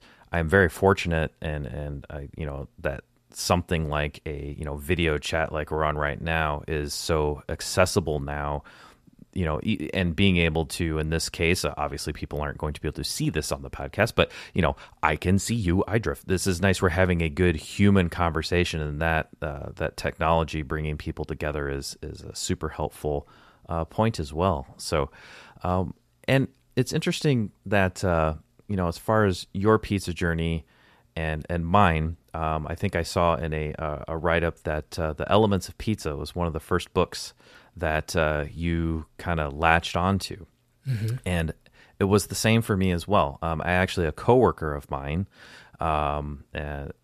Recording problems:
none

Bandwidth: 14.5 kHz